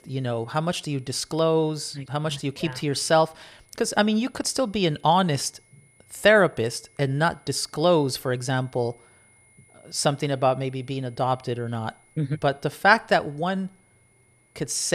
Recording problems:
high-pitched whine; faint; throughout; 2 kHz, 35 dB below the speech
abrupt cut into speech; at the end

